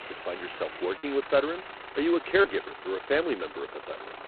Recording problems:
phone-call audio; poor line; nothing above 4 kHz
traffic noise; noticeable; throughout; 15 dB below the speech
crackling; faint; from 0.5 to 3 s; 30 dB below the speech
choppy; occasionally; 2% of the speech affected

